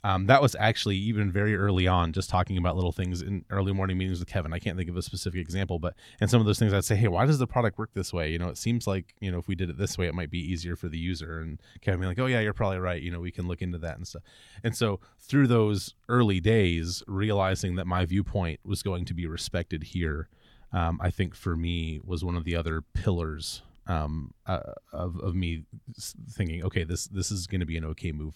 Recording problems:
none

